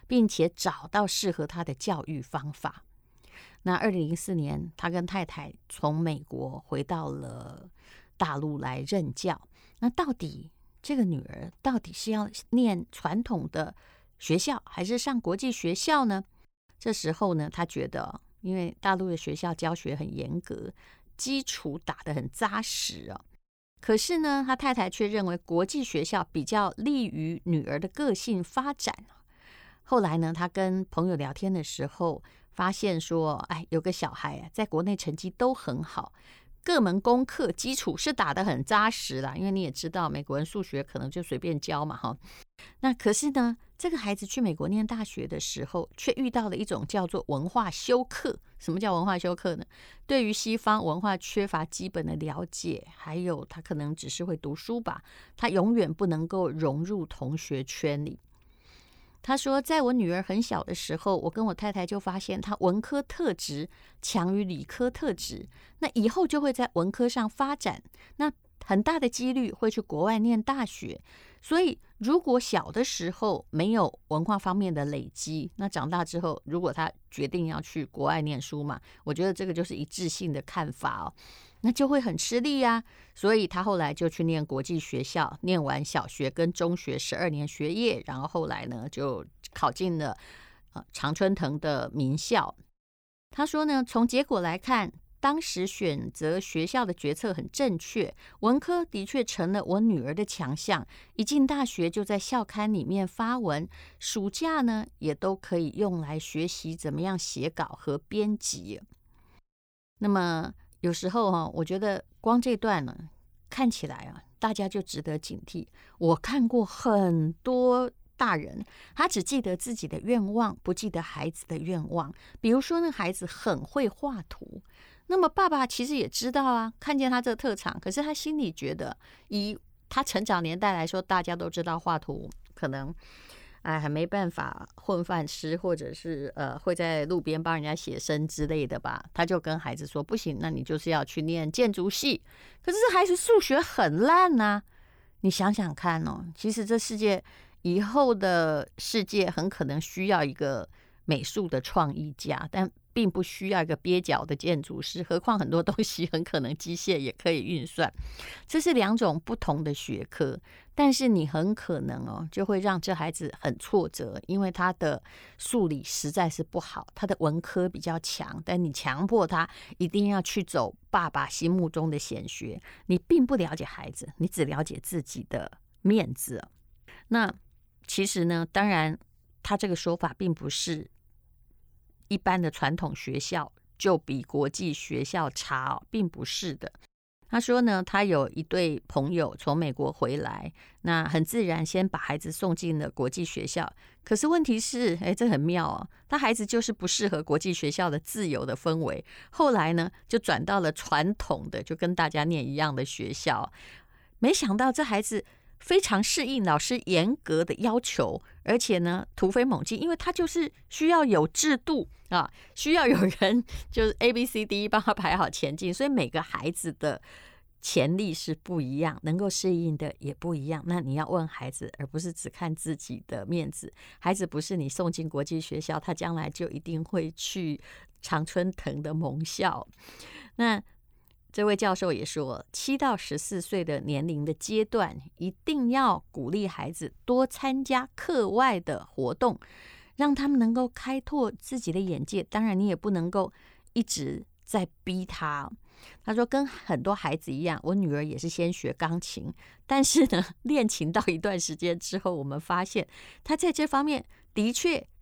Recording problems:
none

